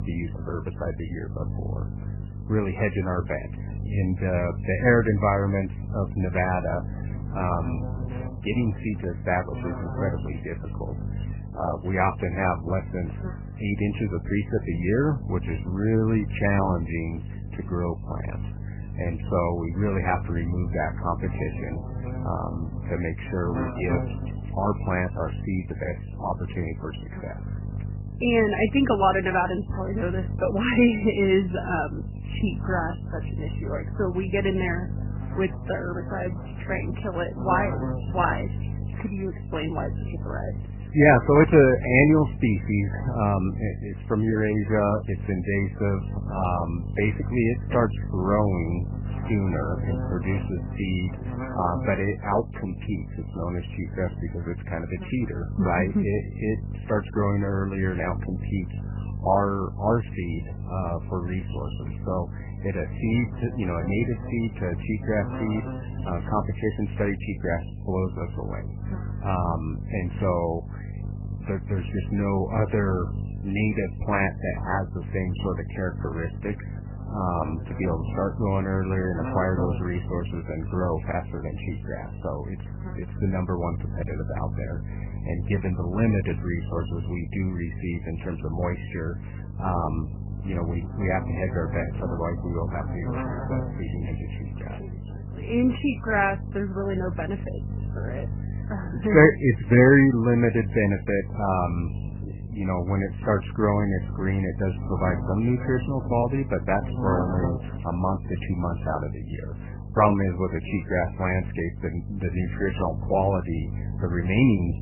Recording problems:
garbled, watery; badly; nothing above 3 kHz
electrical hum; noticeable; throughout; 50 Hz, 15 dB below the speech

